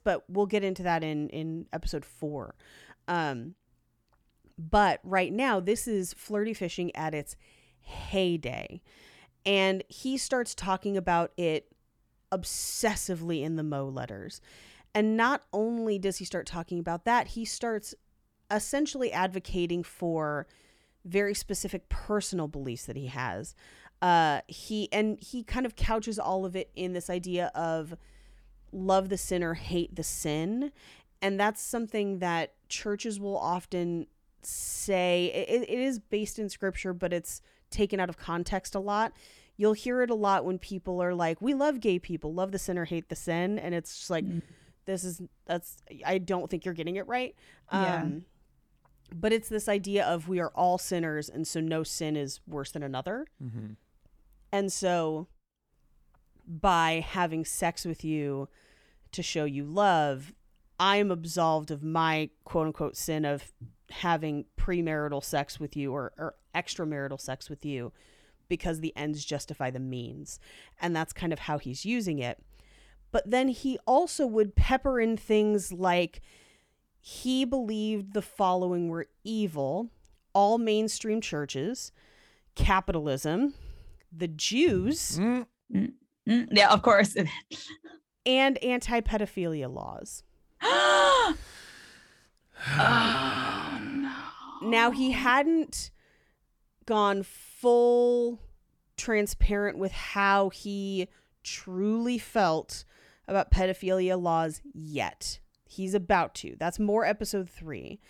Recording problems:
none

